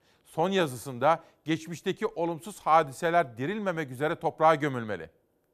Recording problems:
none

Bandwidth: 14.5 kHz